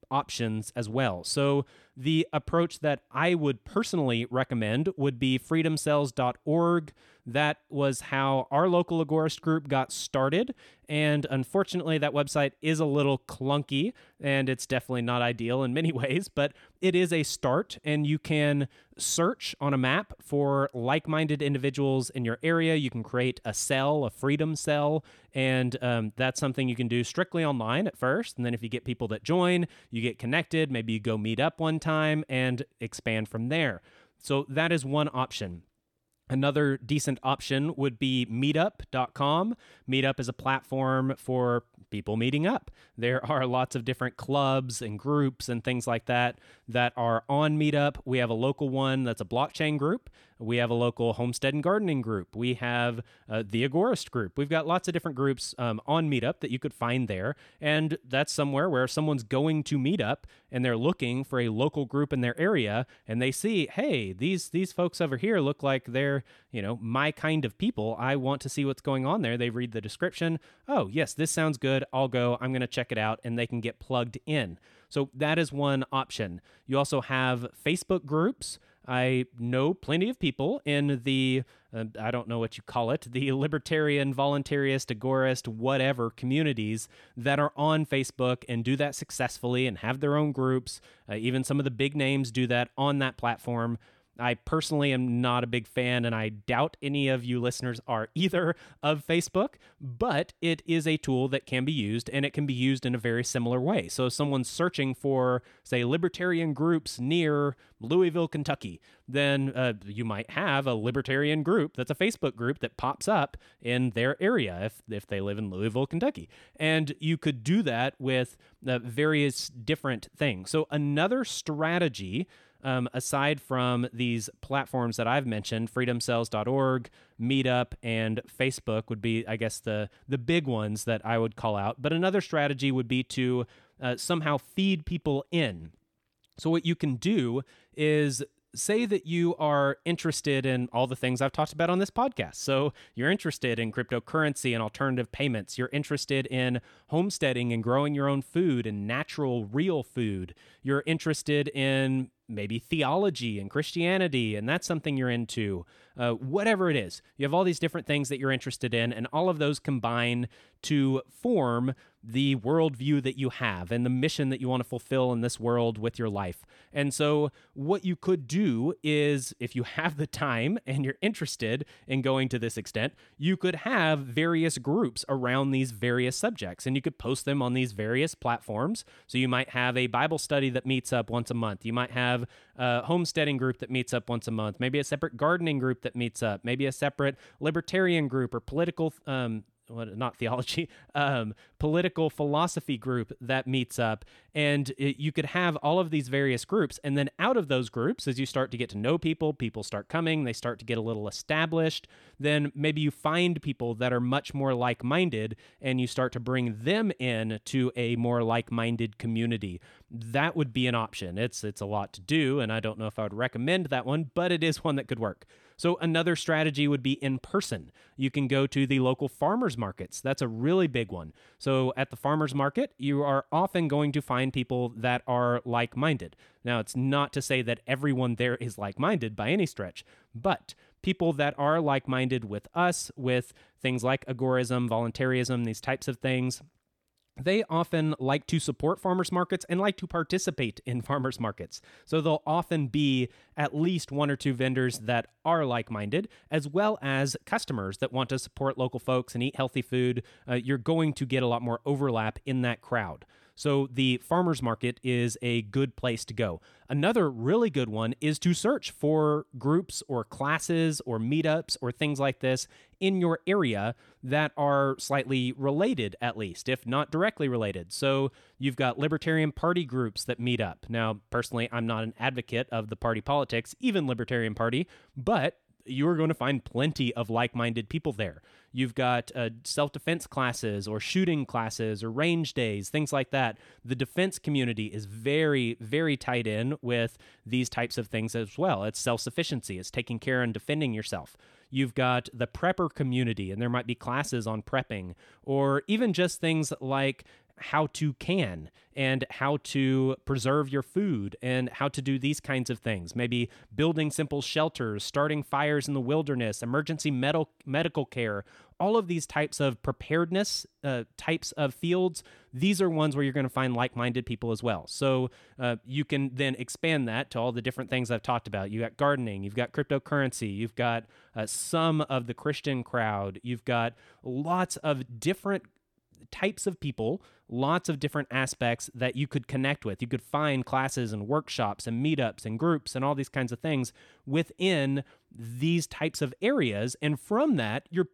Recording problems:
none

